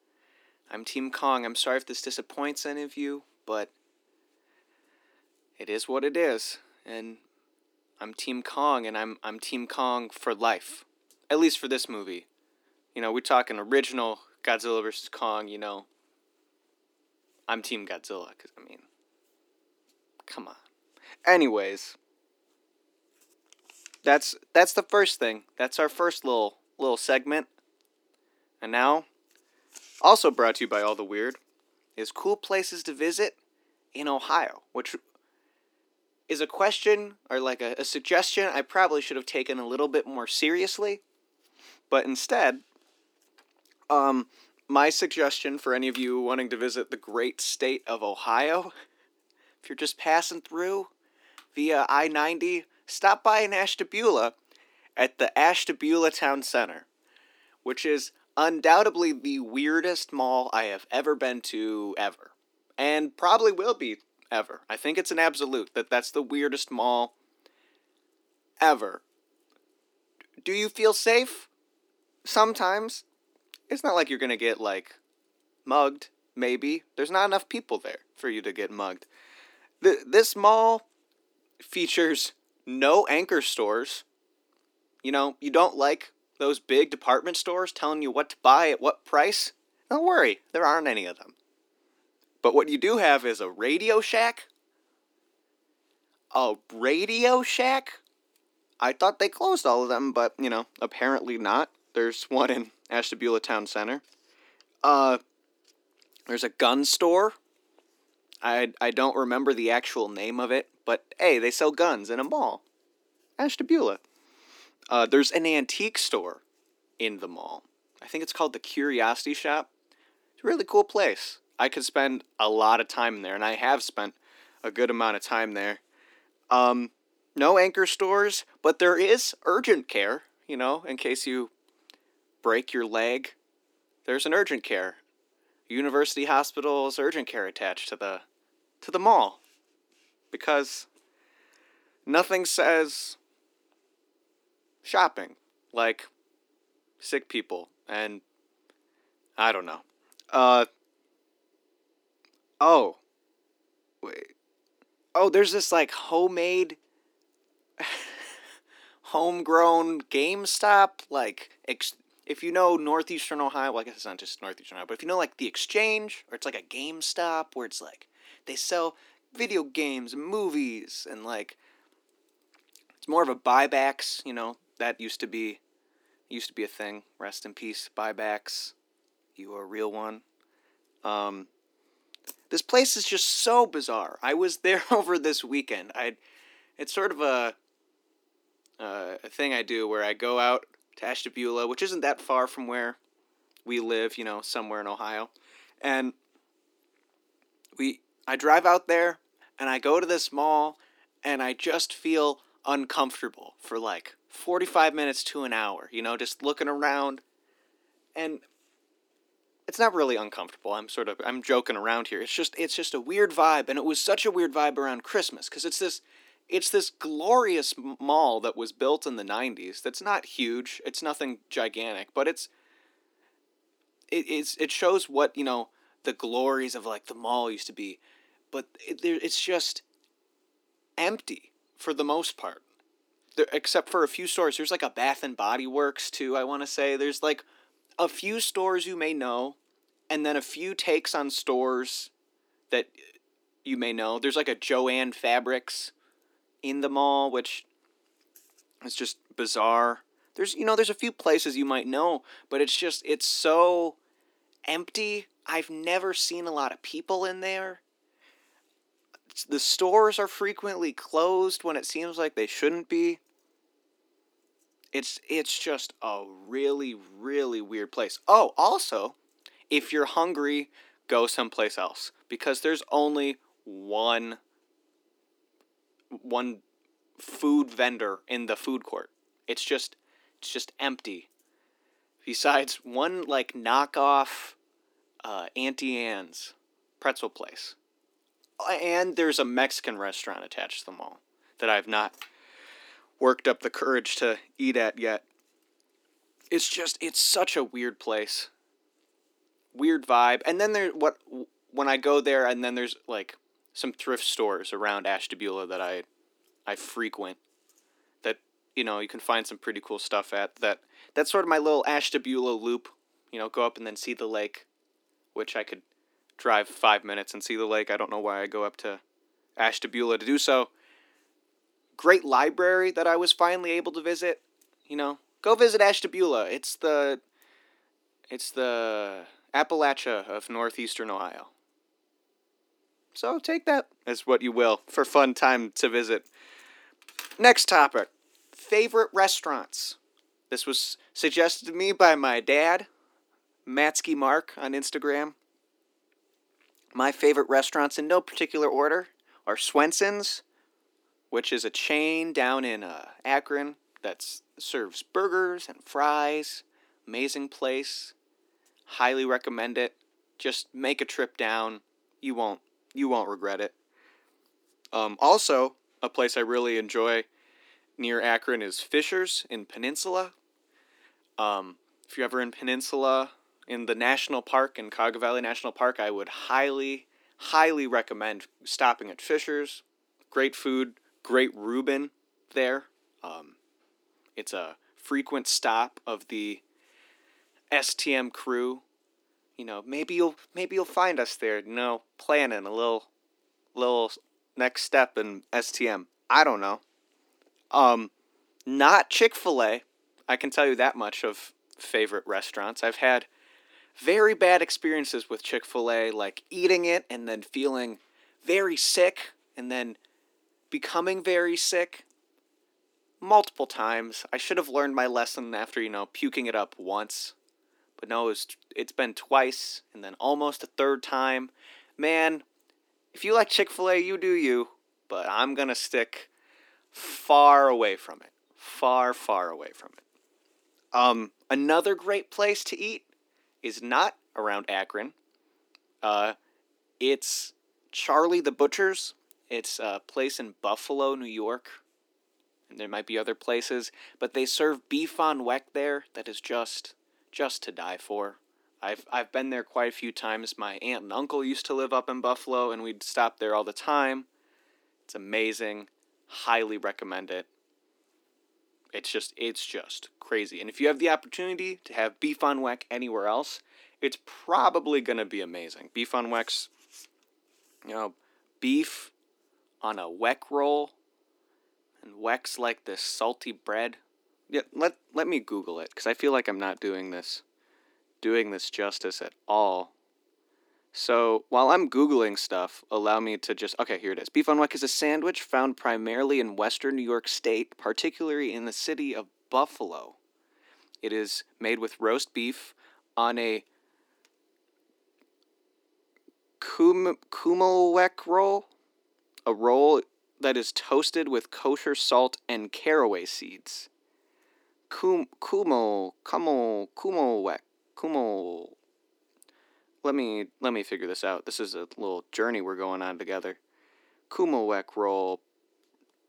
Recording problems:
thin; very slightly; fading below 250 Hz

